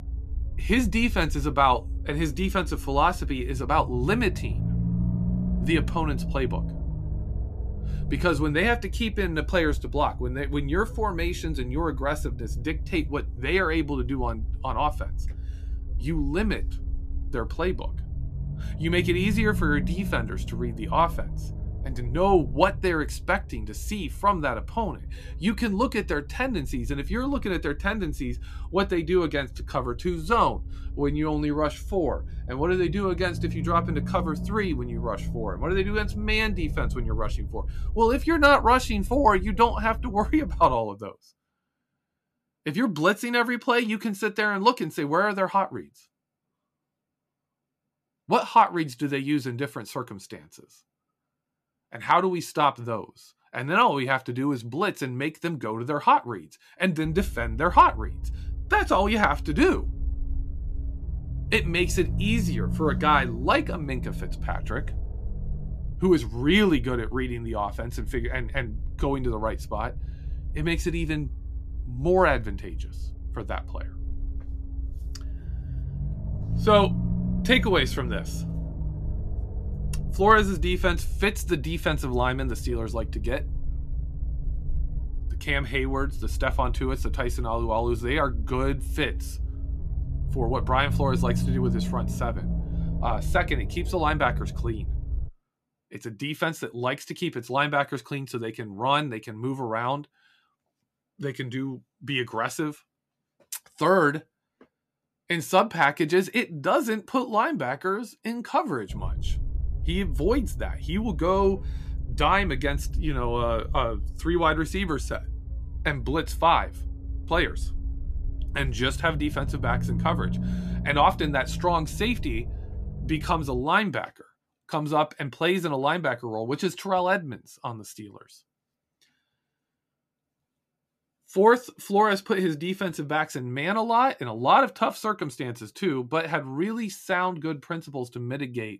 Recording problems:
low rumble; faint; until 41 s, from 57 s to 1:35 and from 1:49 to 2:04; 20 dB below the speech

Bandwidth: 14.5 kHz